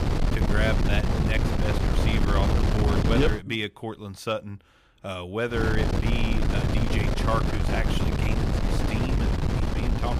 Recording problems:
wind noise on the microphone; heavy; until 3.5 s and from 5.5 s on; 1 dB below the speech

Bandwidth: 15 kHz